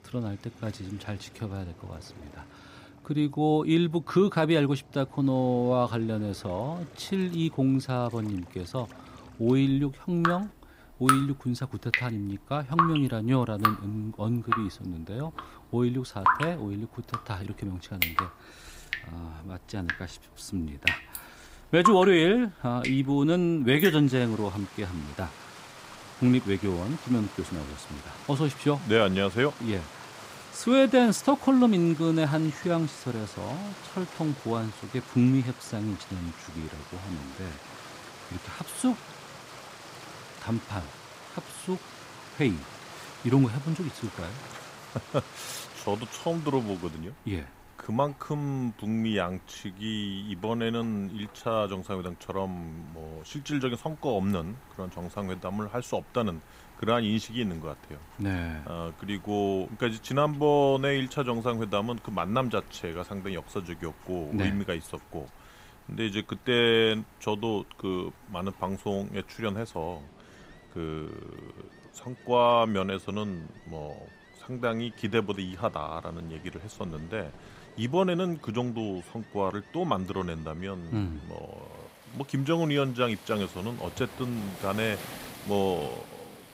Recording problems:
rain or running water; loud; throughout; 8 dB below the speech

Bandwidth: 15.5 kHz